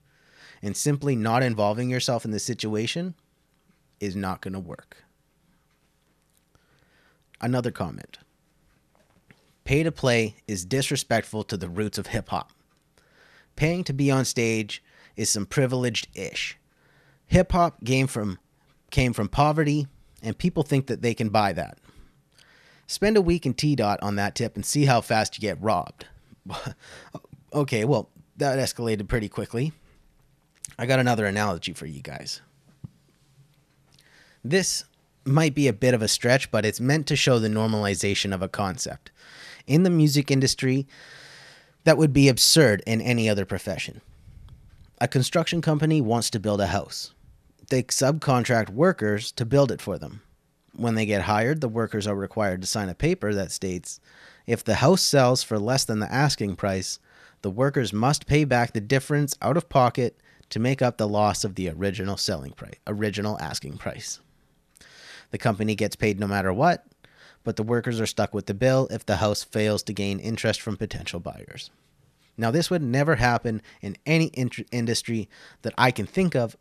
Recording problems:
none

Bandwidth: 13.5 kHz